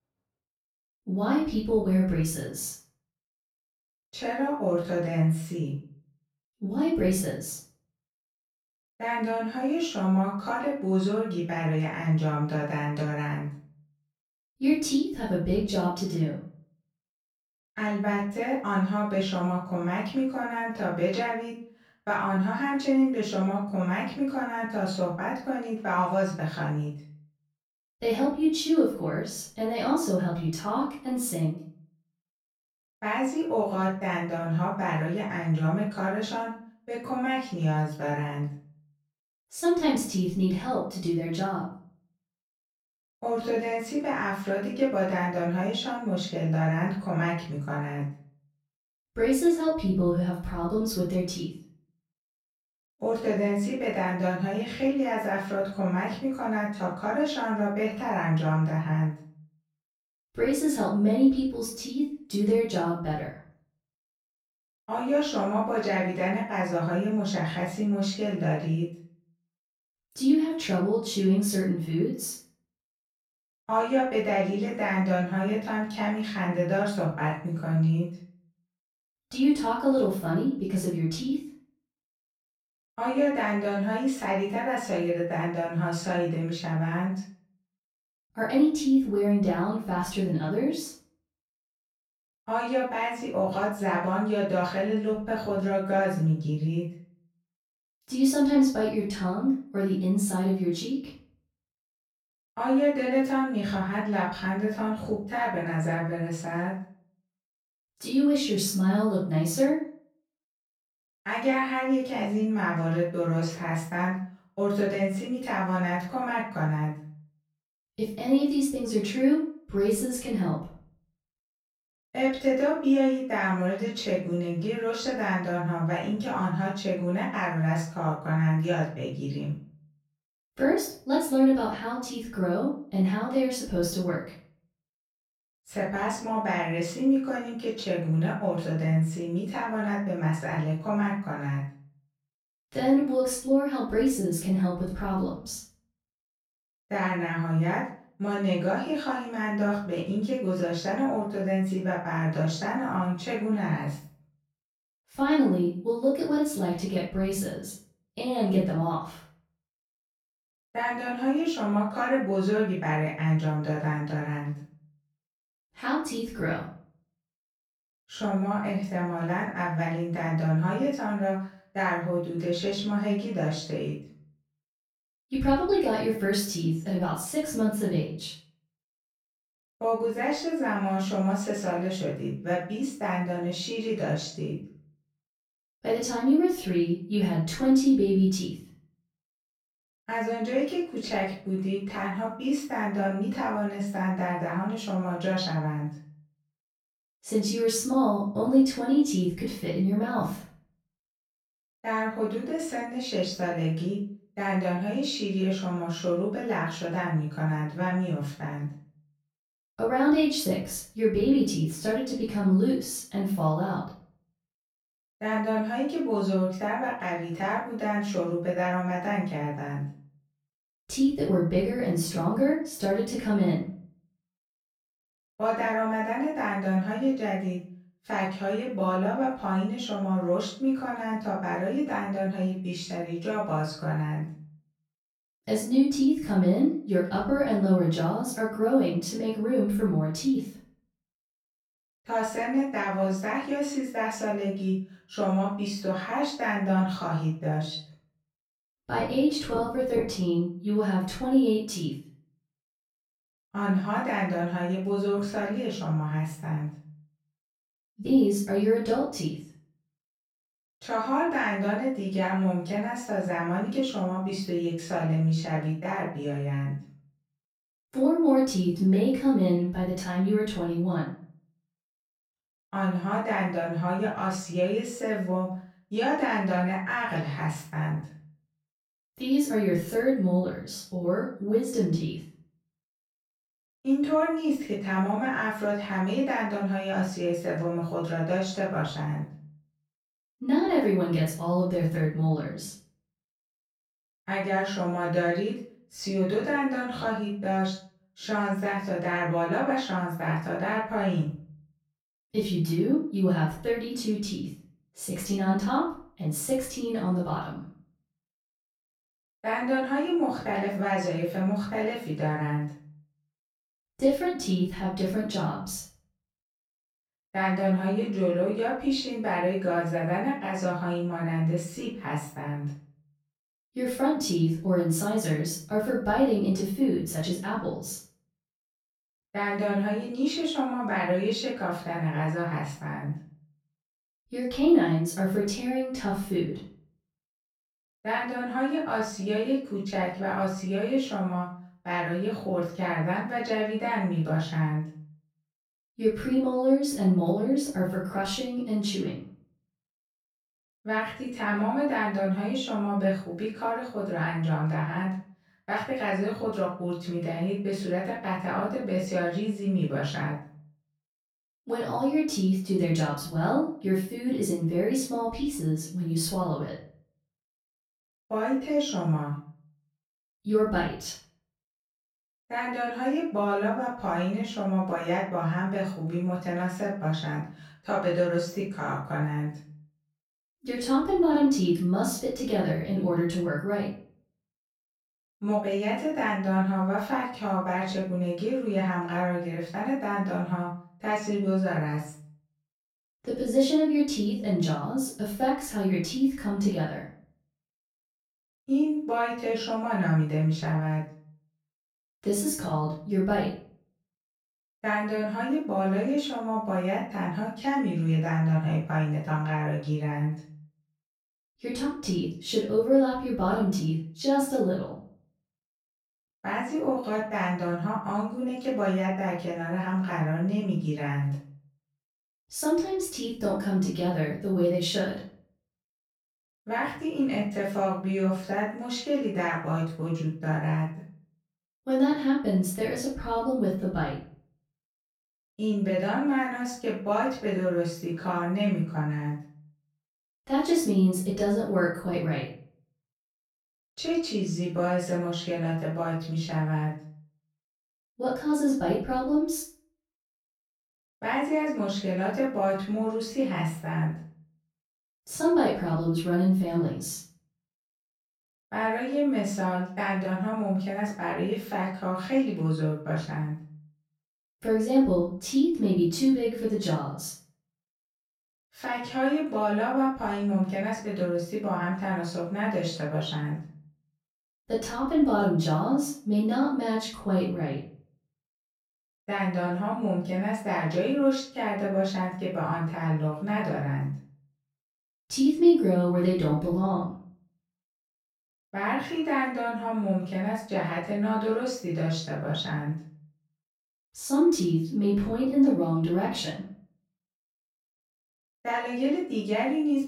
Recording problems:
off-mic speech; far
room echo; noticeable; dies away in 0.4 s

